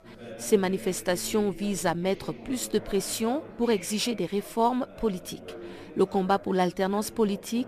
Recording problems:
background chatter; noticeable; throughout; 4 voices, 15 dB below the speech

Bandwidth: 14 kHz